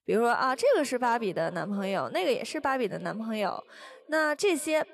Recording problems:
echo of what is said; faint; throughout; 370 ms later, 20 dB below the speech

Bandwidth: 13.5 kHz